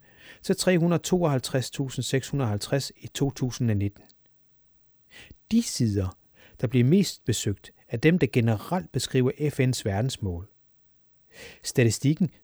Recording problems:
none

